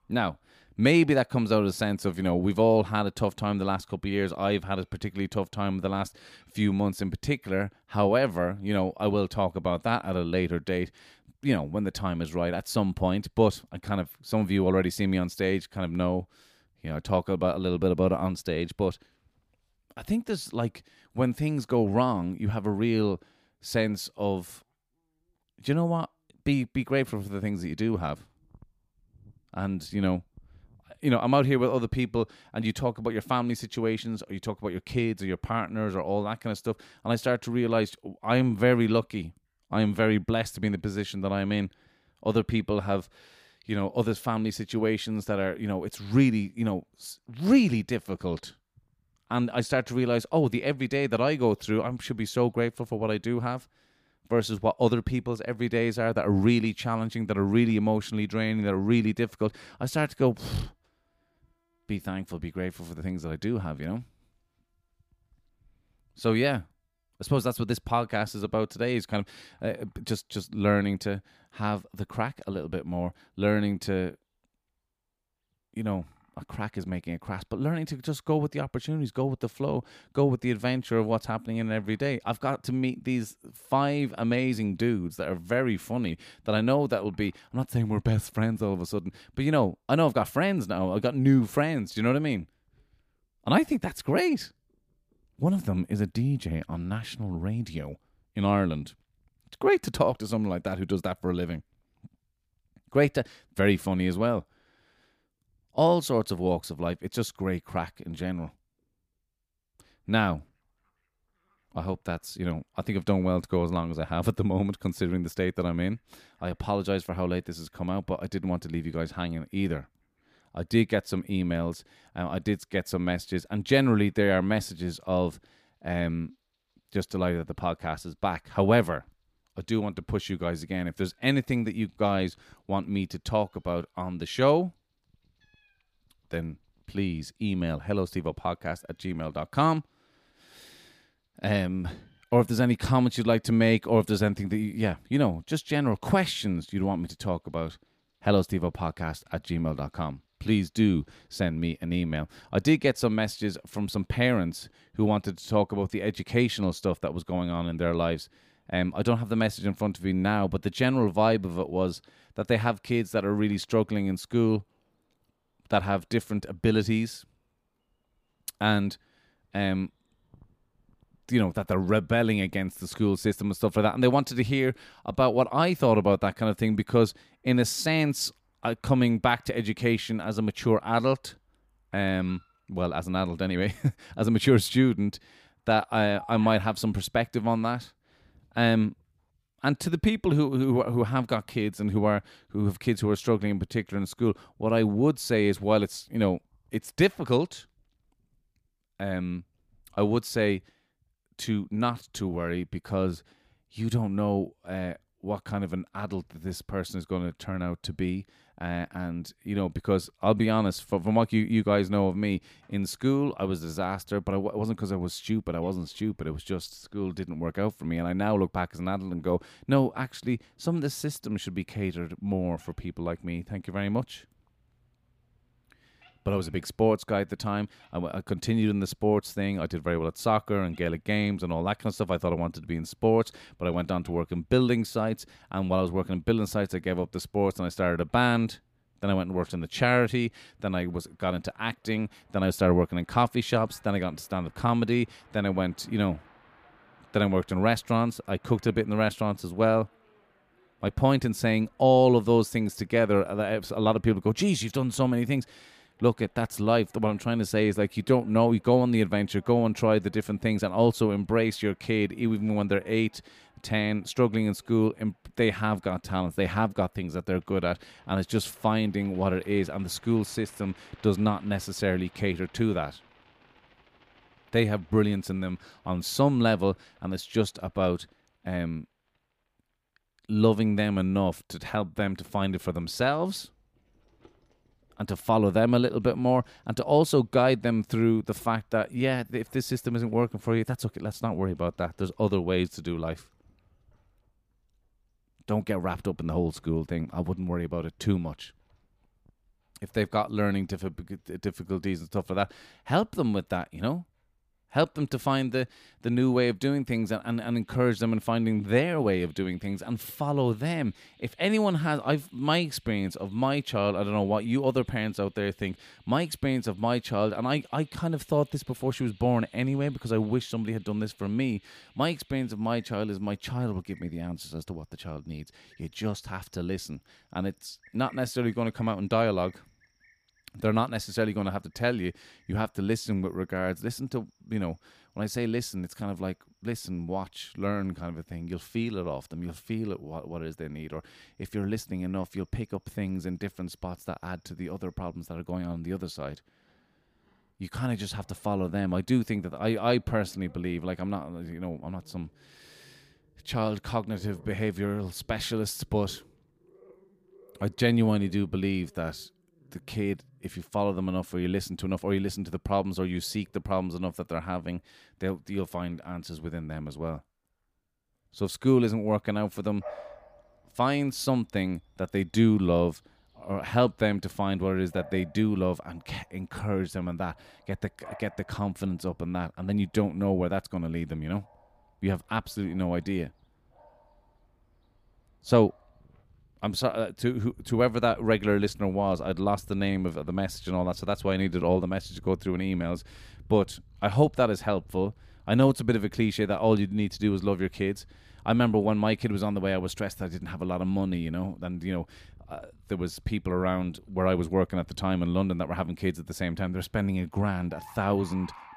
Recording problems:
animal sounds; faint; throughout; 30 dB below the speech

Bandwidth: 15 kHz